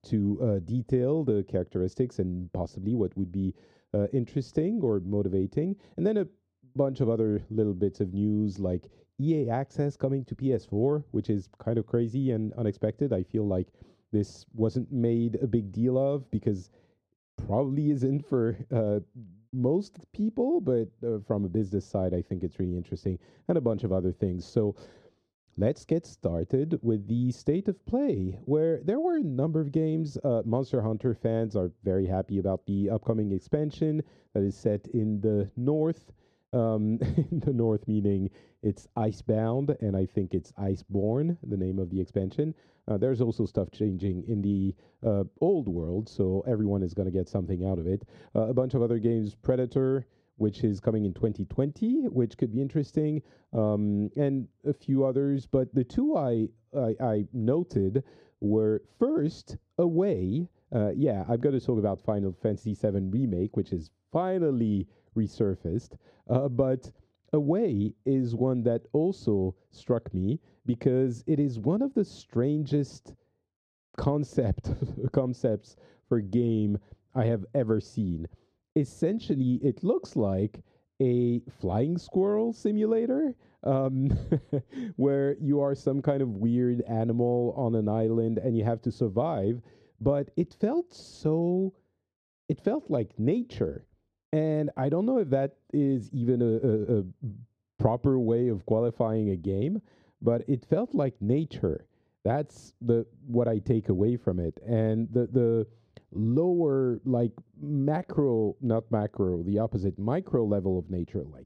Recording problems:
muffled; very; fading above 1 kHz

